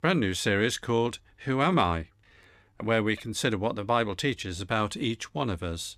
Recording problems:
none

